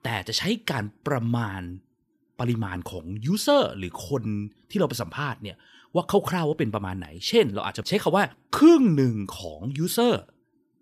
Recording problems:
none

